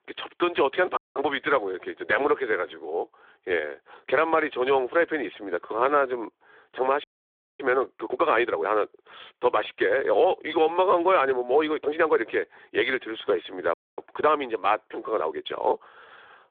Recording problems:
phone-call audio; nothing above 3.5 kHz
audio cutting out; at 1 s, at 7 s for 0.5 s and at 14 s
uneven, jittery; strongly; from 2.5 to 16 s

